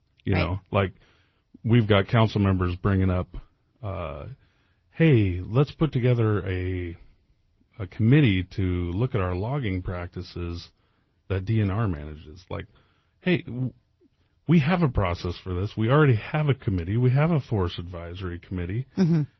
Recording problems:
garbled, watery; slightly

